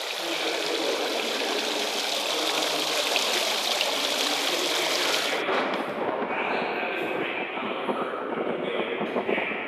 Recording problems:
room echo; strong; dies away in 3 s
off-mic speech; far
thin; somewhat; fading below 300 Hz
rain or running water; very loud; throughout; 4 dB above the speech

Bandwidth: 14.5 kHz